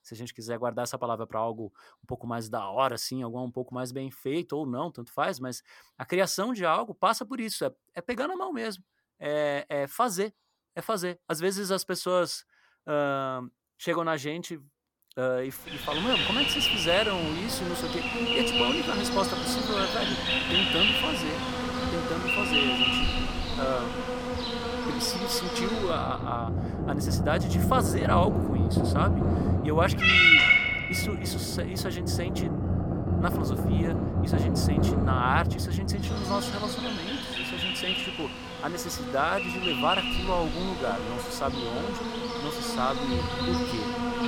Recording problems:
animal sounds; very loud; from 16 s on; 5 dB above the speech

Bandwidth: 17.5 kHz